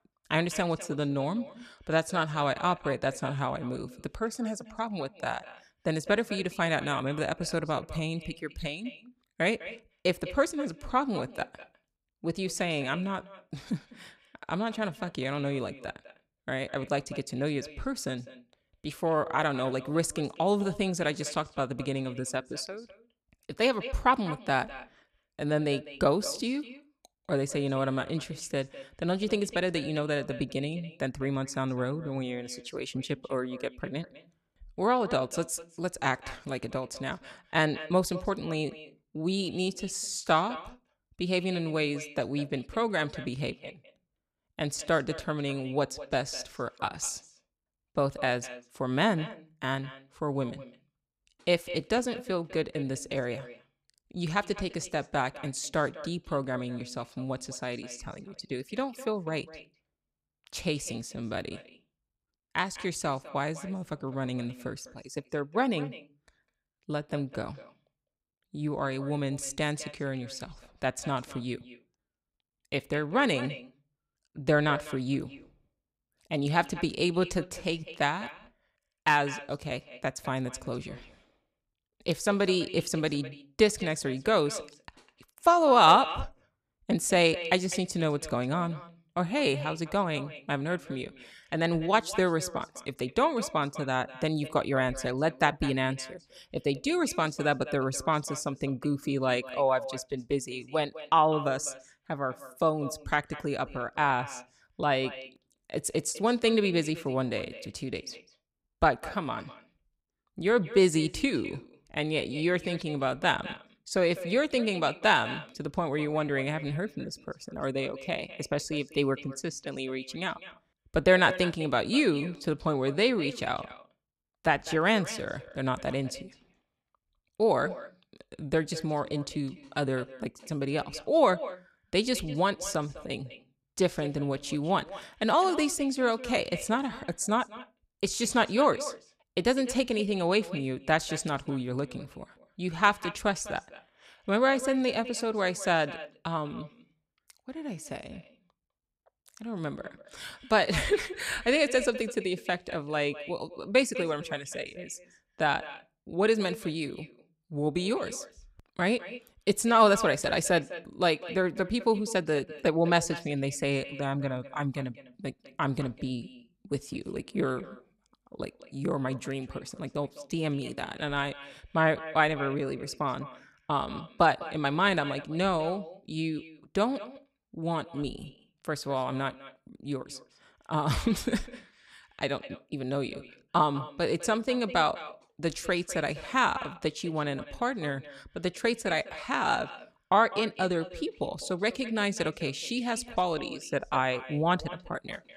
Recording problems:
echo of what is said; noticeable; throughout; 200 ms later, 15 dB below the speech

